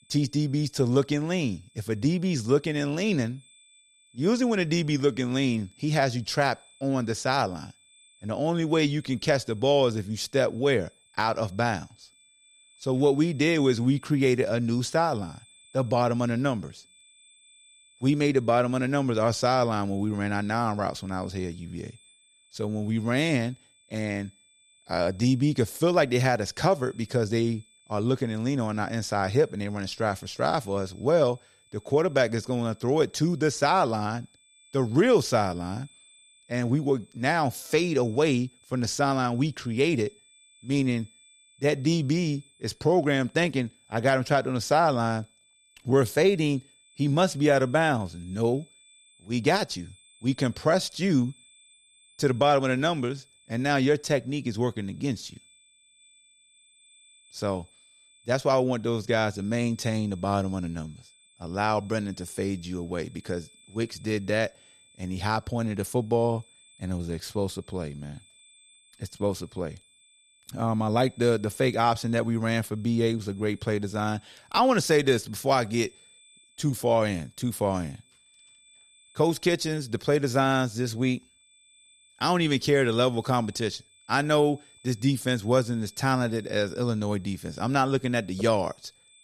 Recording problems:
high-pitched whine; faint; throughout; 3.5 kHz, 30 dB below the speech

